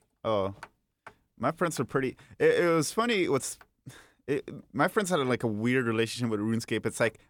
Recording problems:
none

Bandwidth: 18.5 kHz